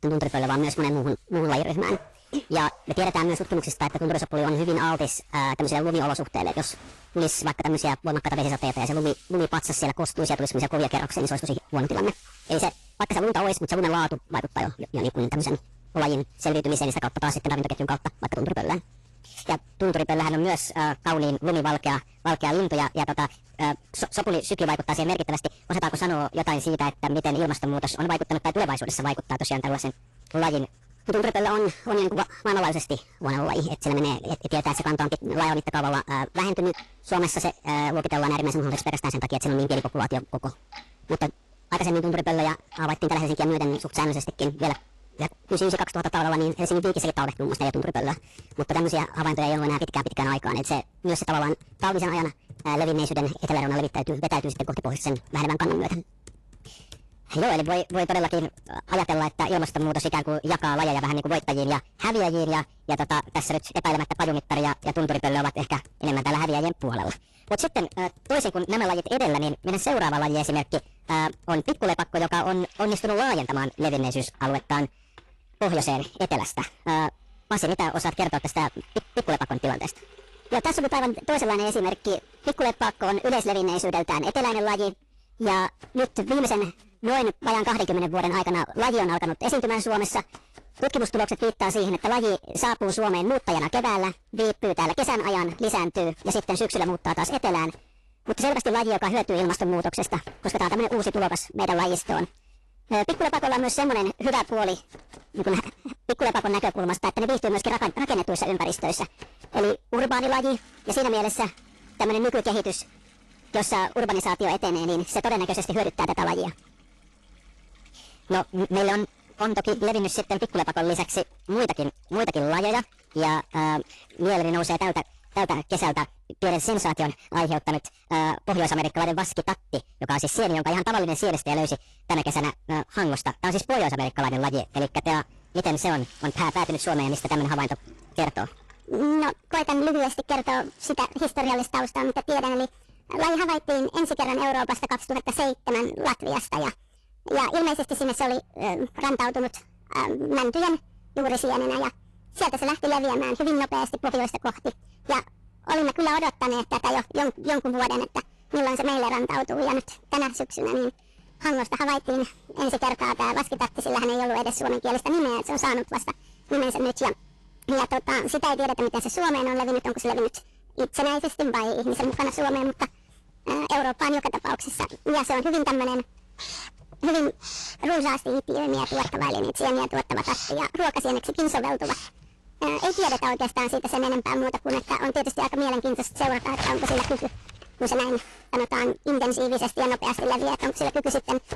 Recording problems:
distortion; heavy; 13% of the sound clipped
wrong speed and pitch; too fast and too high; 1.5 times normal speed
garbled, watery; slightly; nothing above 11.5 kHz
household noises; faint; throughout; 20 dB below the speech

